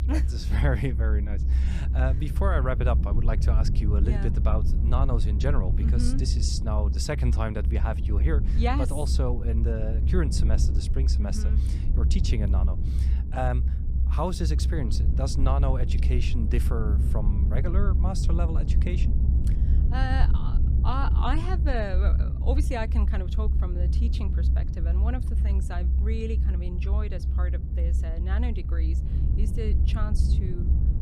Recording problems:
low rumble; loud; throughout; 7 dB below the speech

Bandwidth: 15.5 kHz